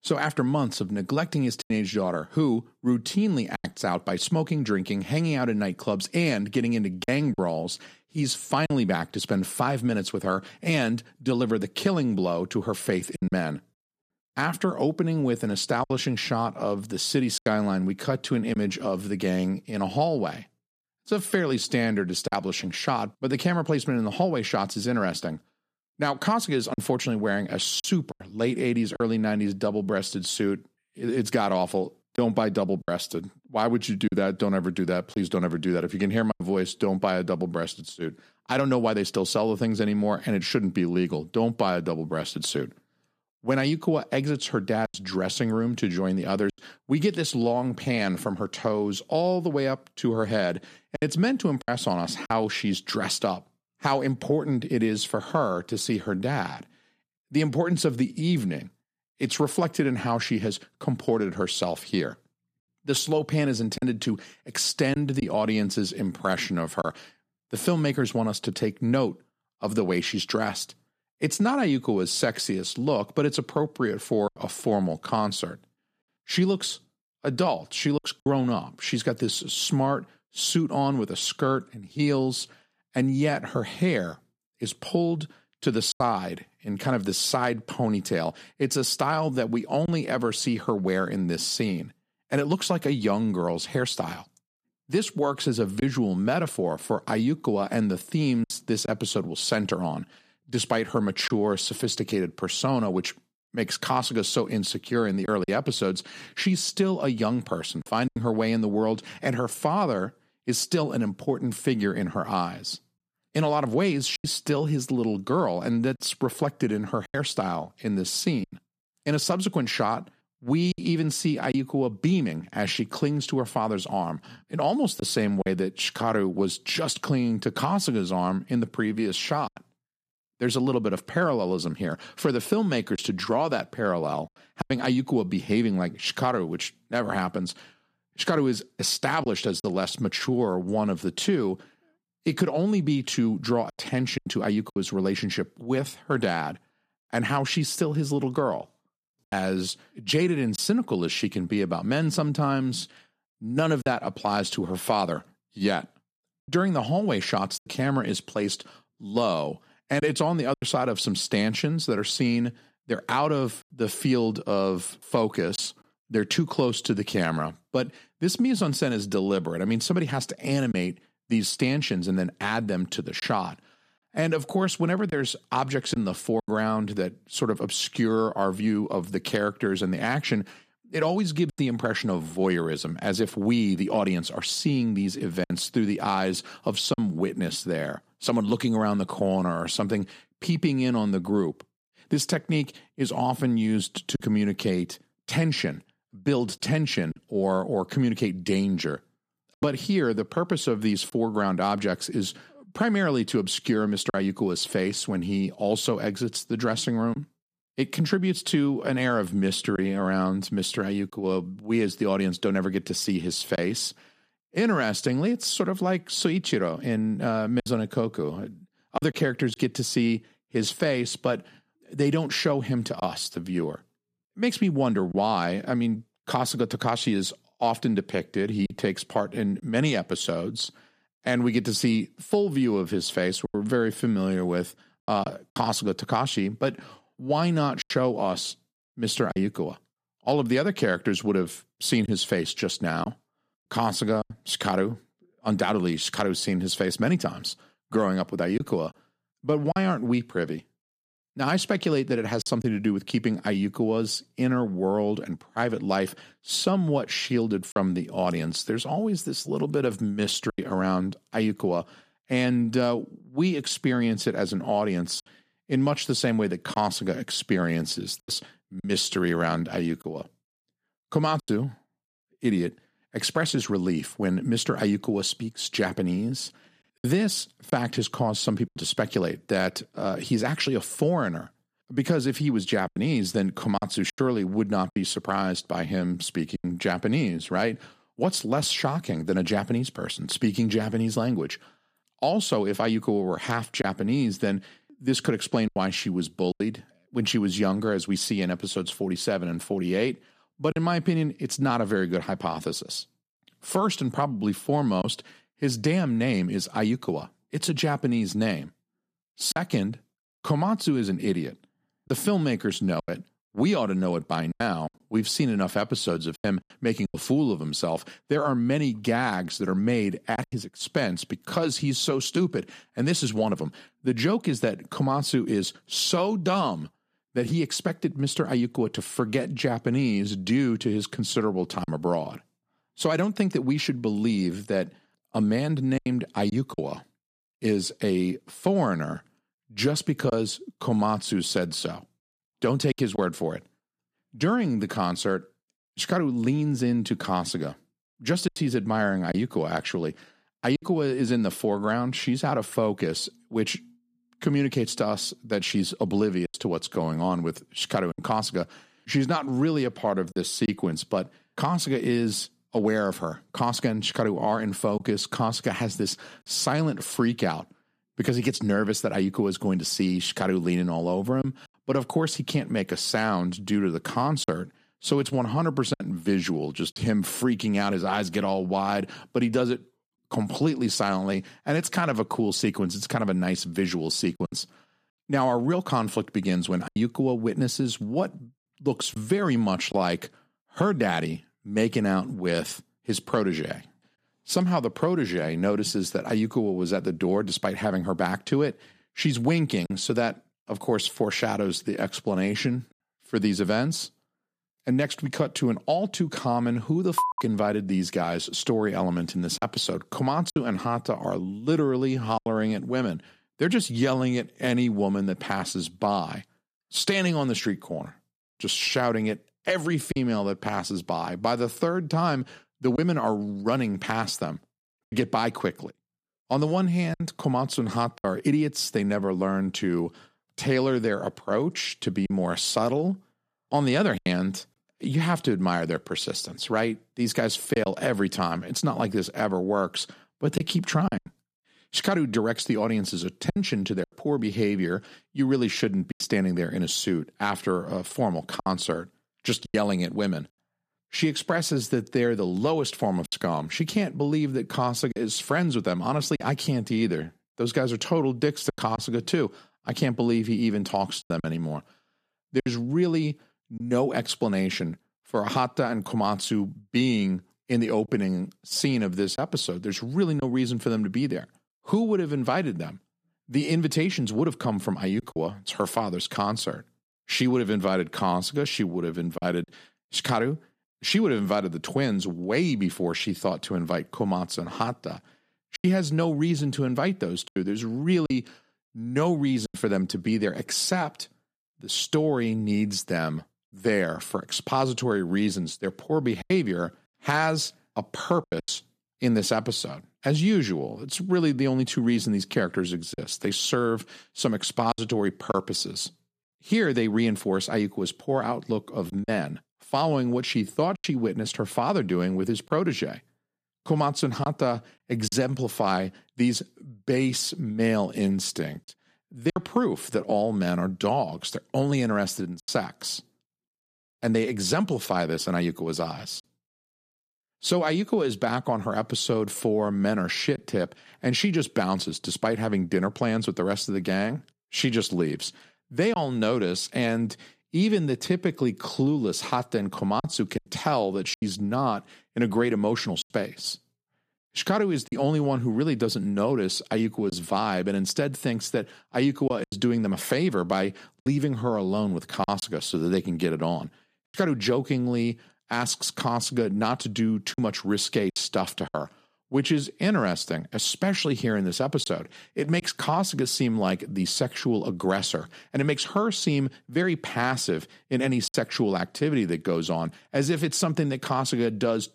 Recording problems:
choppy; occasionally; 2% of the speech affected

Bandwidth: 14.5 kHz